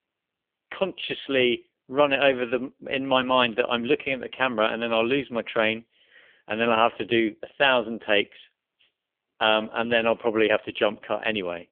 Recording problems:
phone-call audio; poor line; nothing above 3.5 kHz

